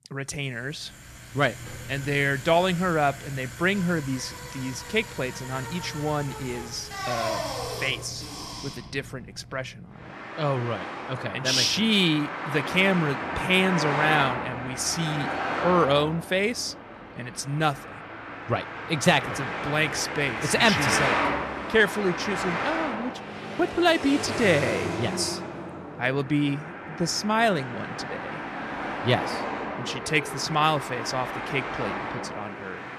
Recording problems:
traffic noise; loud; throughout; 6 dB below the speech

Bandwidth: 14.5 kHz